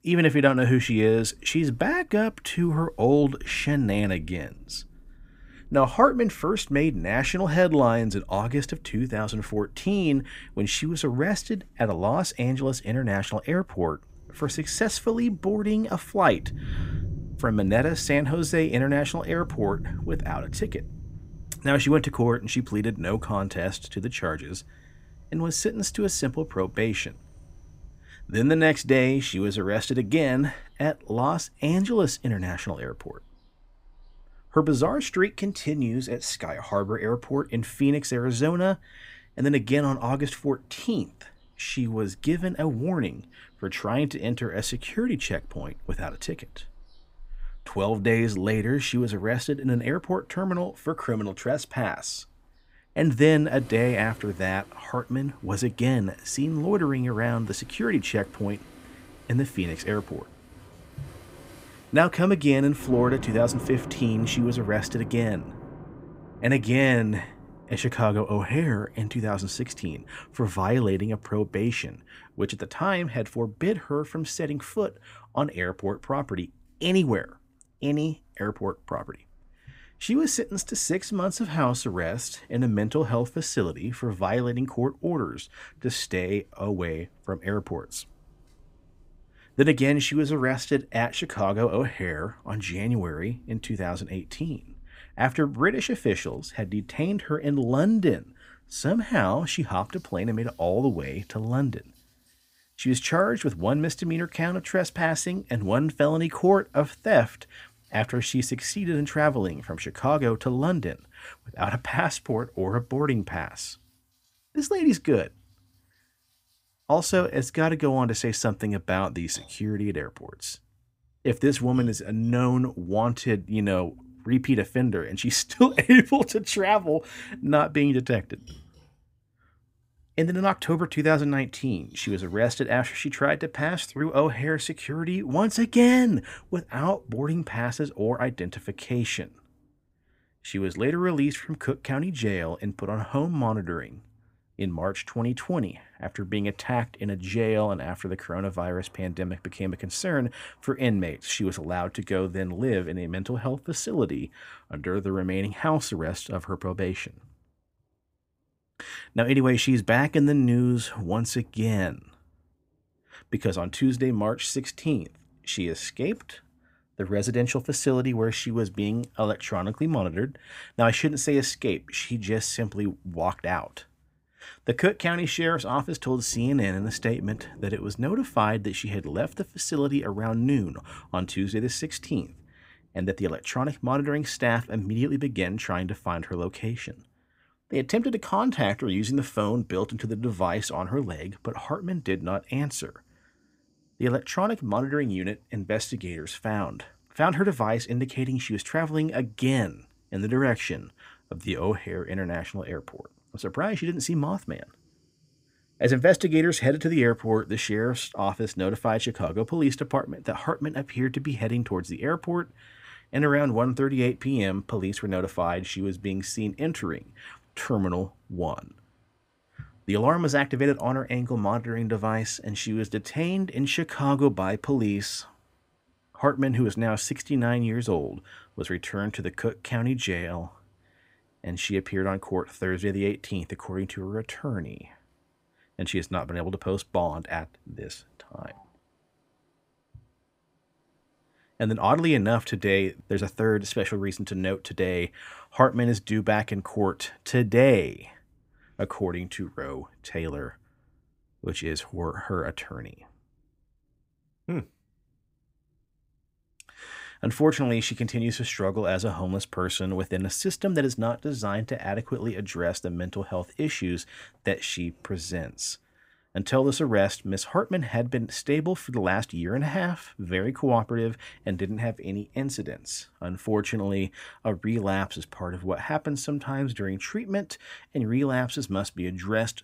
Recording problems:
rain or running water; noticeable; throughout; 20 dB below the speech

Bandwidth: 15.5 kHz